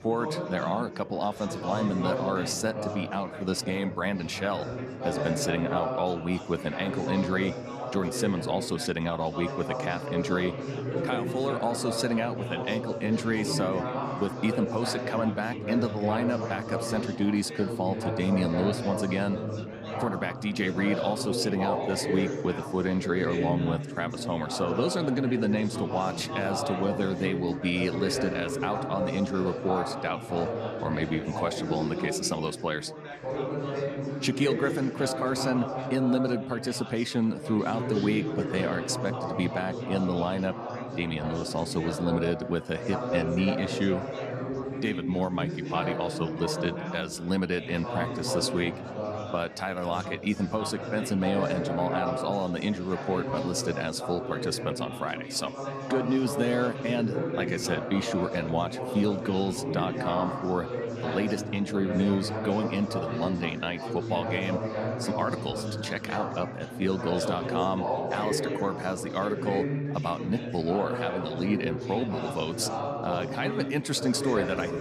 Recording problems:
chatter from many people; loud; throughout; 3 dB below the speech

